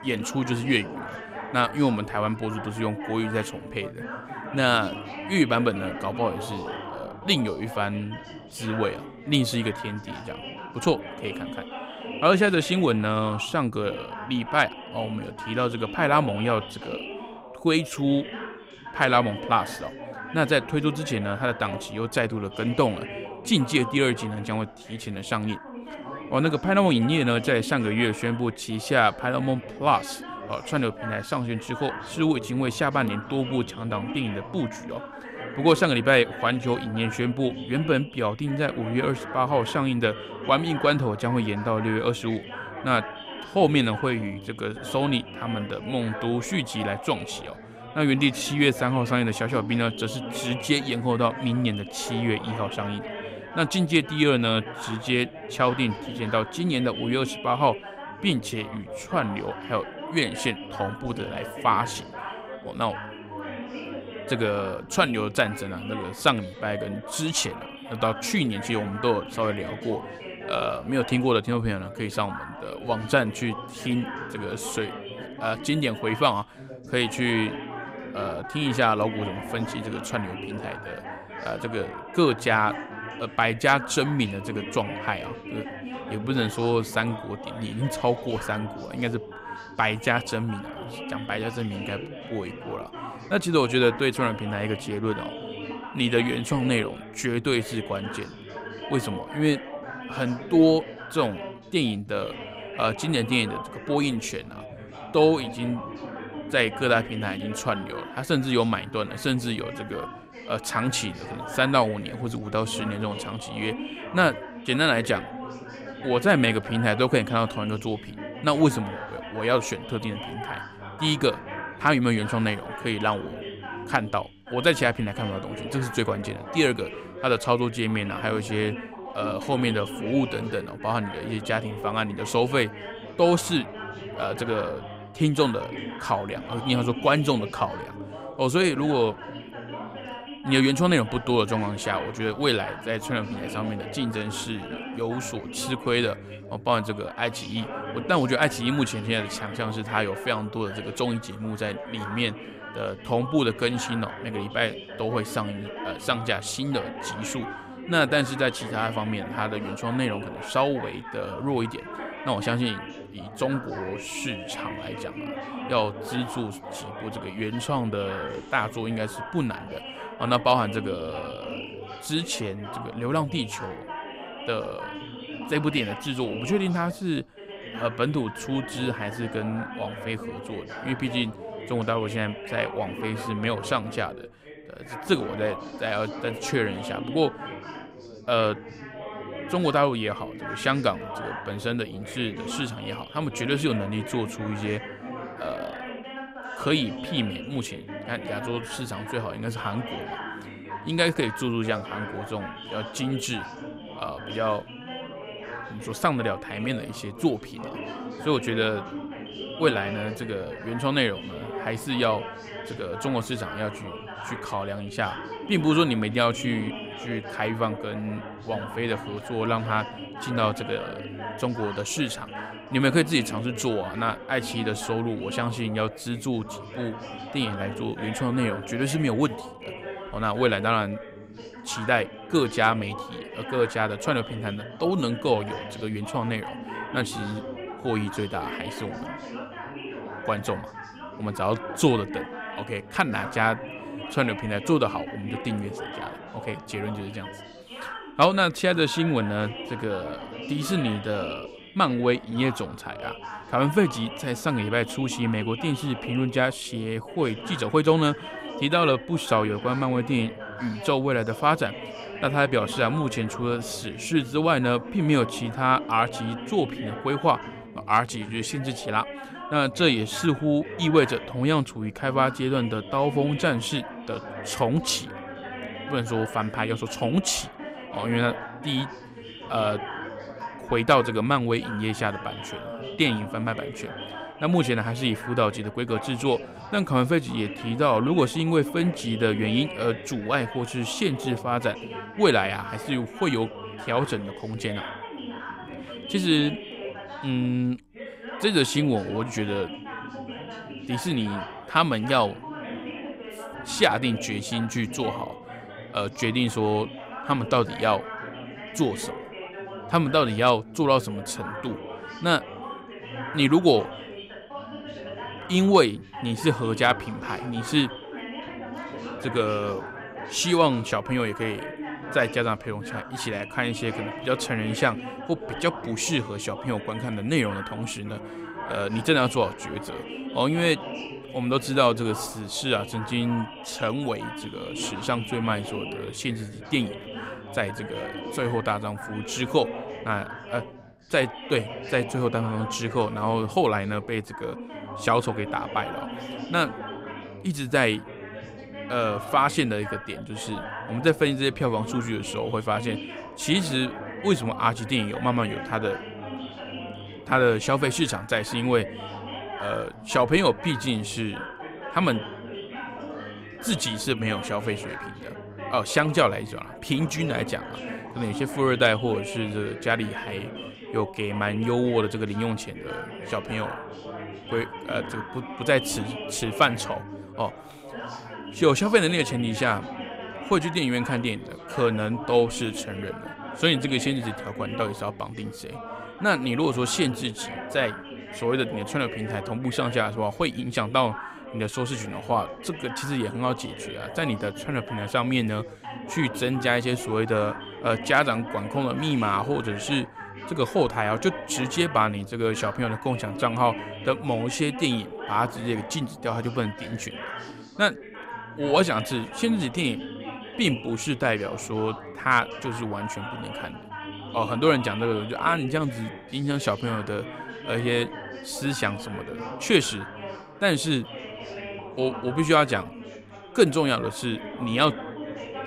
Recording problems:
background chatter; noticeable; throughout; 4 voices, 10 dB below the speech

